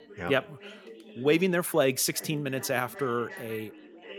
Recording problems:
background chatter; noticeable; throughout; 3 voices, 20 dB below the speech

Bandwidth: 17.5 kHz